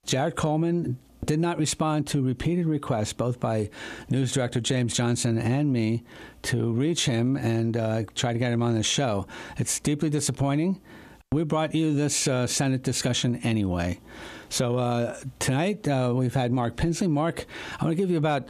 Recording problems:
squashed, flat; heavily

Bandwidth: 14.5 kHz